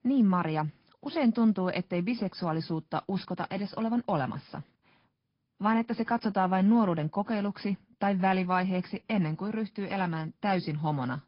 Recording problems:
high frequencies cut off; noticeable; nothing above 5 kHz
garbled, watery; slightly

